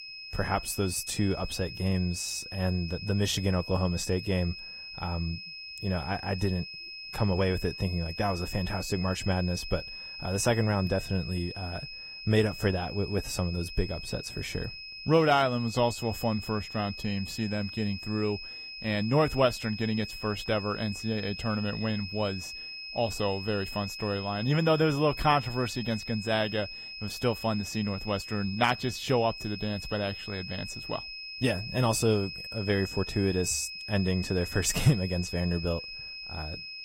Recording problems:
garbled, watery; slightly; nothing above 15.5 kHz
high-pitched whine; loud; throughout; 5 kHz, 9 dB below the speech

